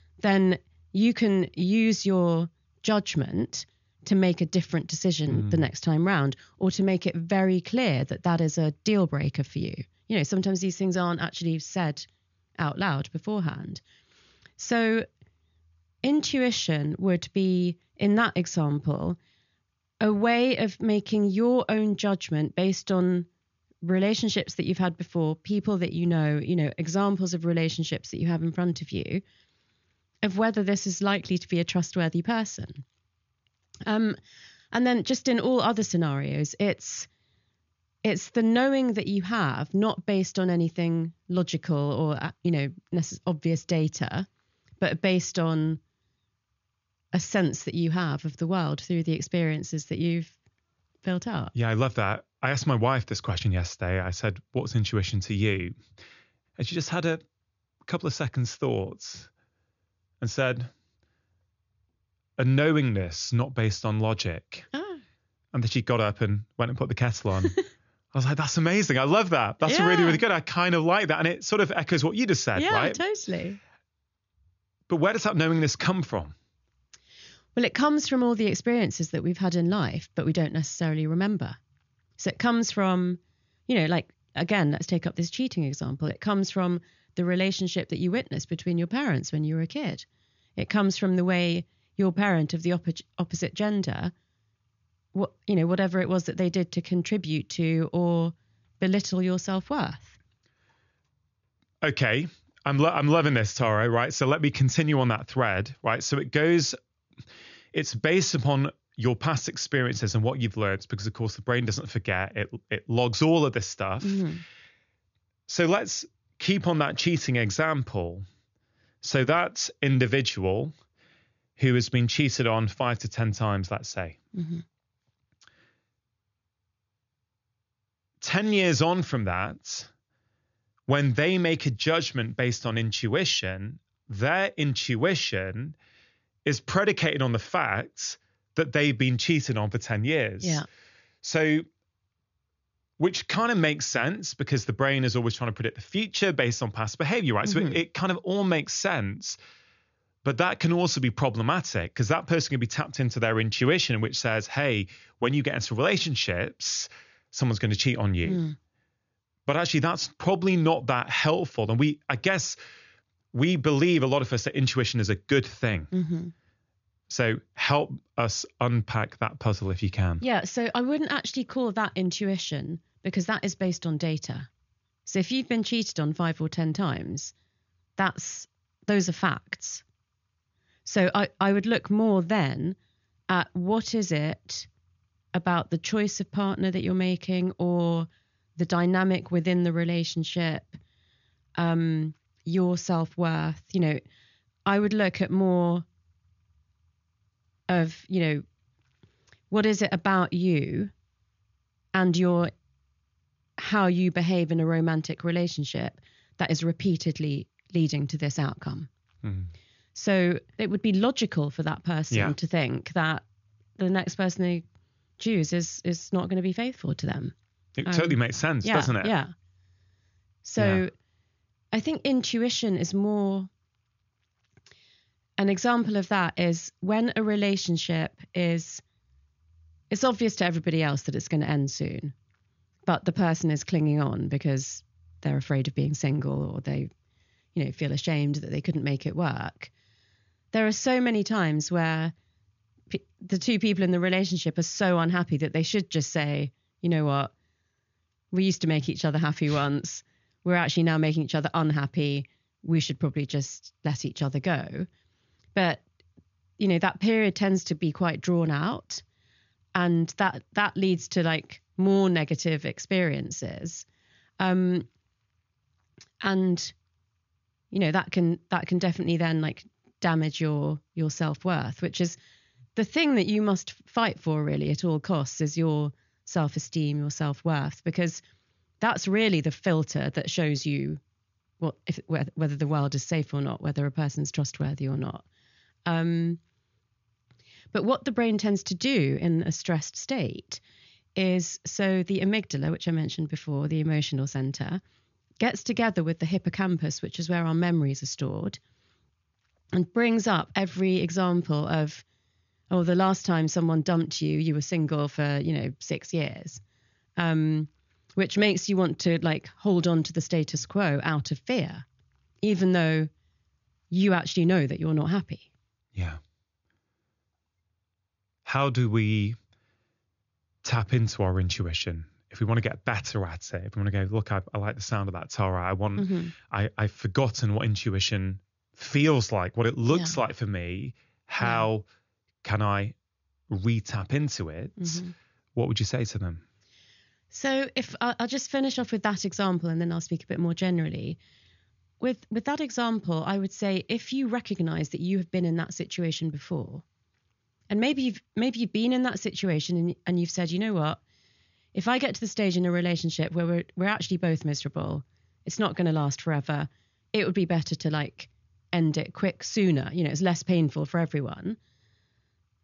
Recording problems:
high frequencies cut off; noticeable; nothing above 7 kHz

